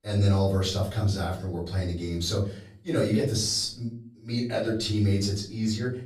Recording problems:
off-mic speech; far
room echo; slight; dies away in 0.5 s

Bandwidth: 15 kHz